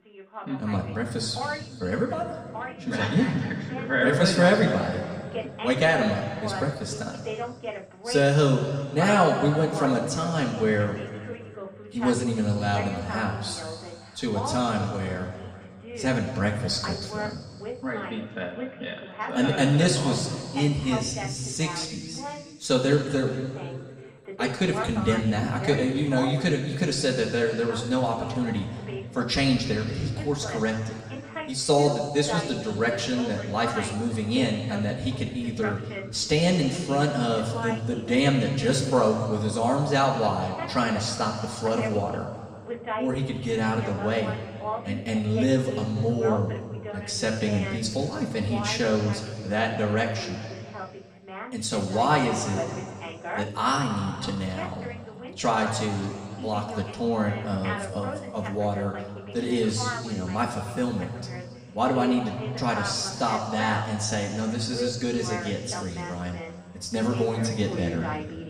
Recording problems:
room echo; noticeable; dies away in 2.3 s
off-mic speech; somewhat distant
voice in the background; noticeable; throughout; 10 dB below the speech

